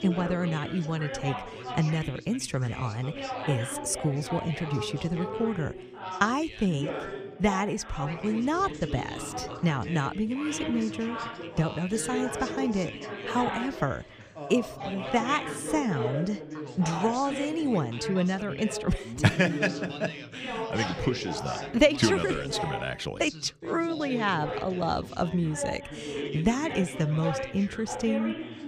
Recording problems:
background chatter; loud; throughout; 3 voices, 7 dB below the speech

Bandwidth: 15 kHz